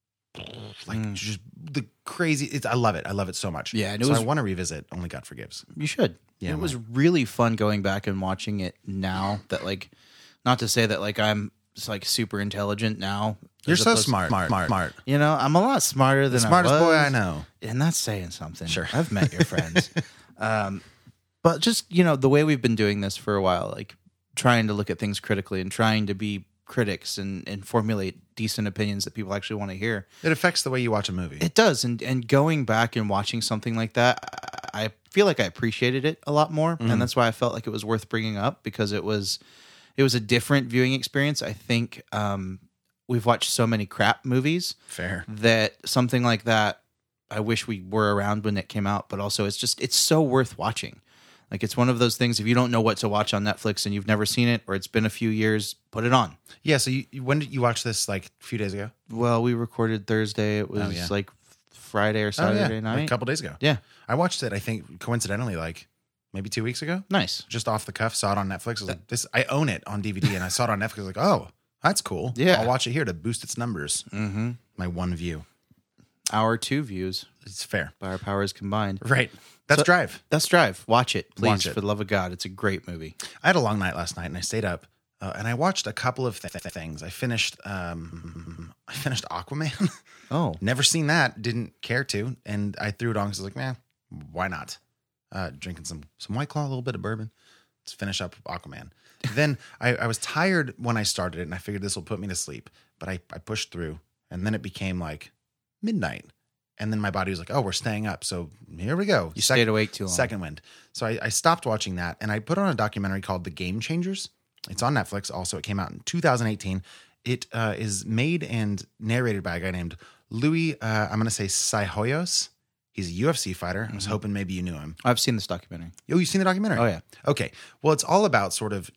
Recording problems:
audio stuttering; 4 times, first at 14 s

